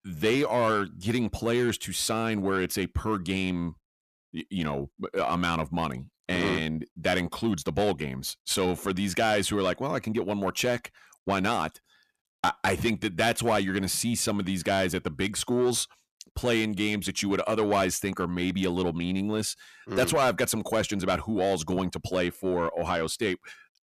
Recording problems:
distortion; slight; 10 dB below the speech

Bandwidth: 14.5 kHz